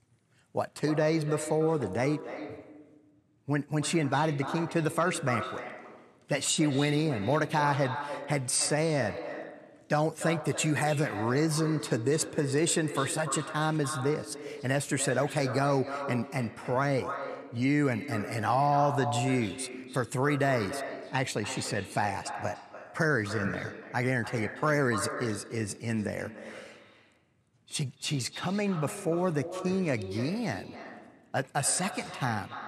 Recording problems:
echo of what is said; strong; throughout; 290 ms later, 10 dB below the speech

